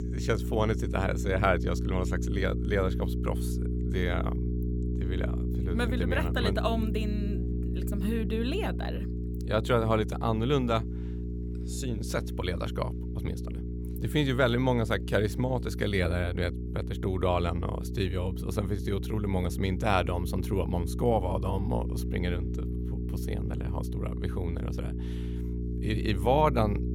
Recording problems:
electrical hum; noticeable; throughout; 60 Hz, 10 dB below the speech

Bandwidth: 17.5 kHz